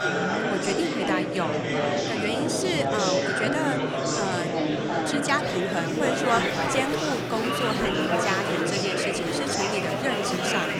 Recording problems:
murmuring crowd; very loud; throughout; 3 dB above the speech

